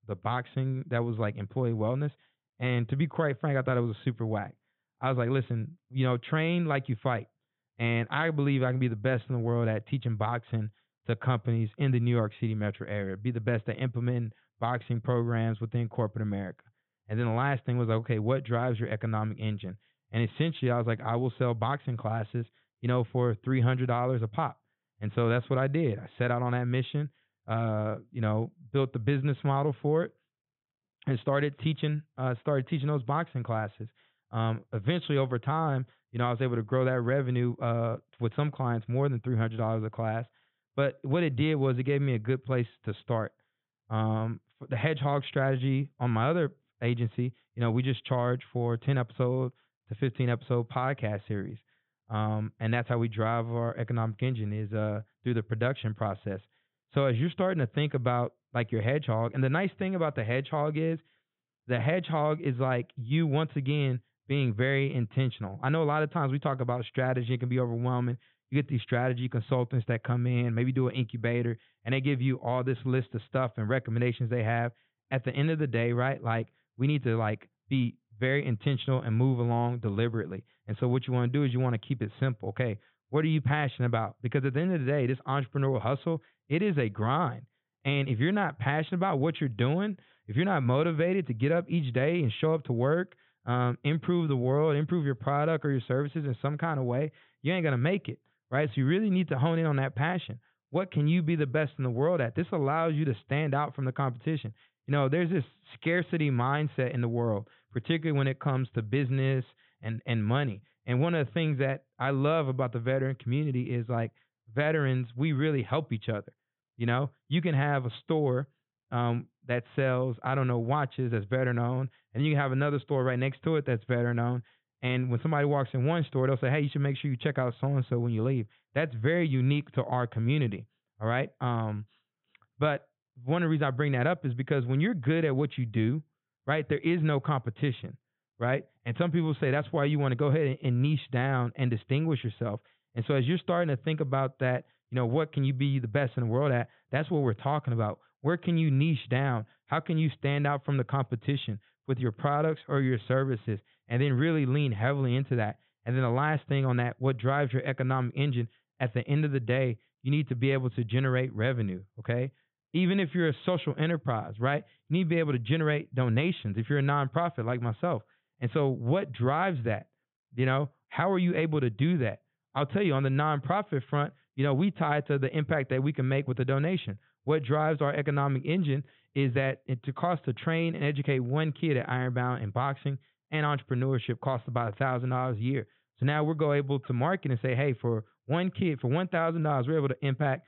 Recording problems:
high frequencies cut off; severe; nothing above 3.5 kHz

